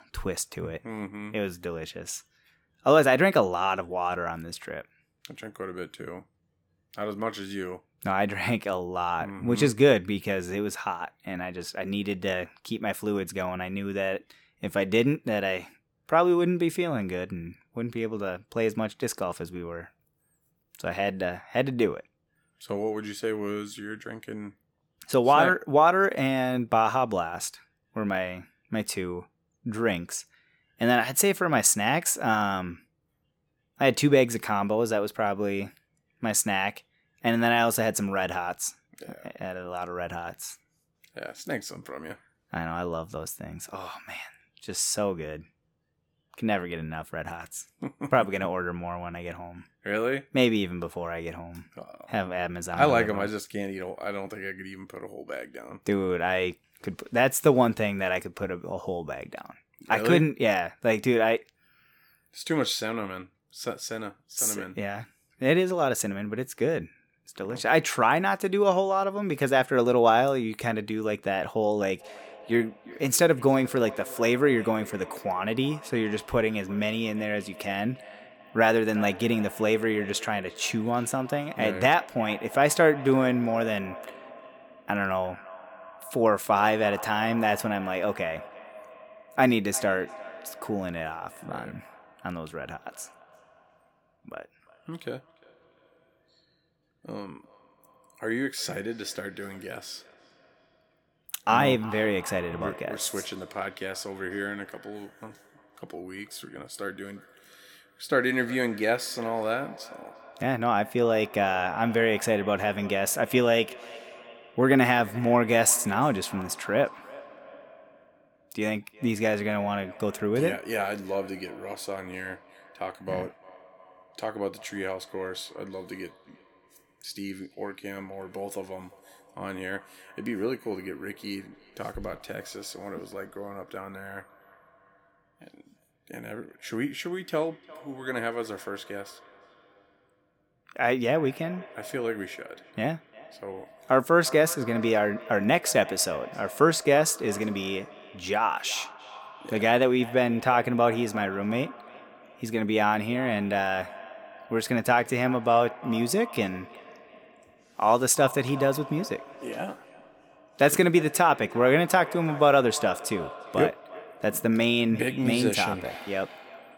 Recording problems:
echo of what is said; noticeable; from 1:12 on; 350 ms later, 20 dB below the speech

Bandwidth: 17.5 kHz